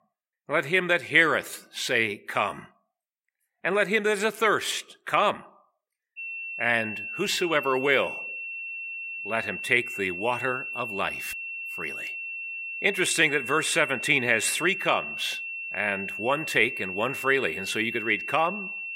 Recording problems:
thin; very slightly; fading below 600 Hz
high-pitched whine; loud; from 6 s on; 2.5 kHz, 7 dB below the speech

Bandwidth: 16 kHz